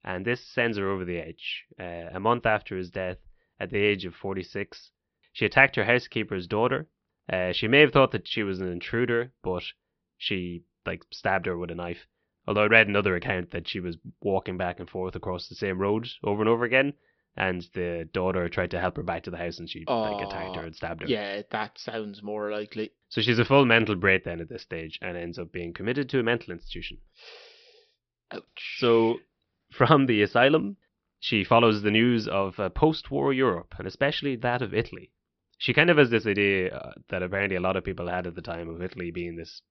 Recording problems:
high frequencies cut off; noticeable; nothing above 5.5 kHz

